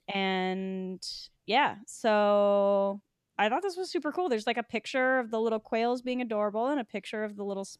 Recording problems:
none

